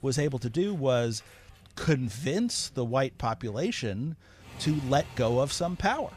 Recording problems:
traffic noise; faint; throughout; 20 dB below the speech

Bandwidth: 15 kHz